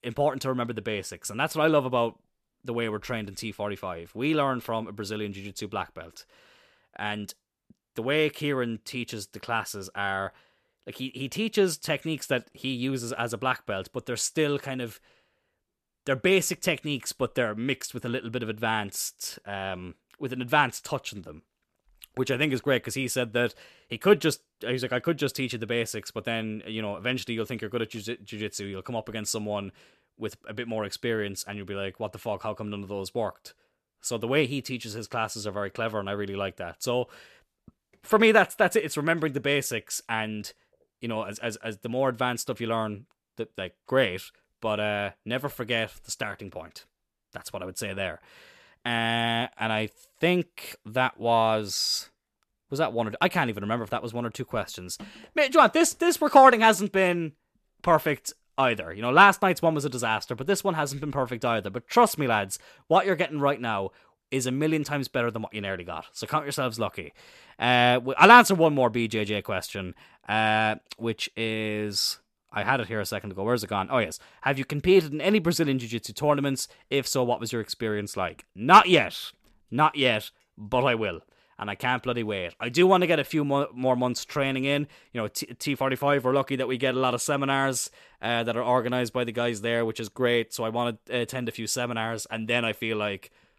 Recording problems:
none

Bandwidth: 14 kHz